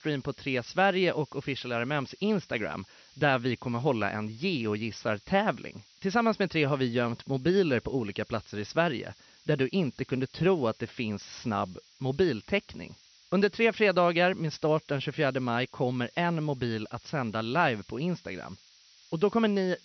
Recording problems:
high frequencies cut off; noticeable; nothing above 6 kHz
hiss; faint; throughout; 25 dB below the speech

